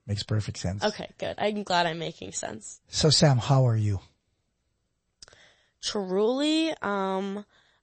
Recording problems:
garbled, watery; slightly; nothing above 8 kHz

